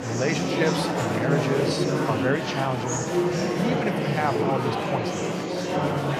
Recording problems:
murmuring crowd; very loud; throughout; 3 dB above the speech

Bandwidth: 15 kHz